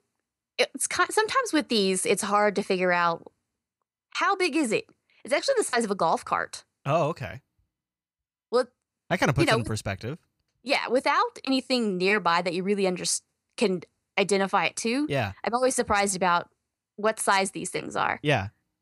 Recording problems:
none

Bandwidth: 15 kHz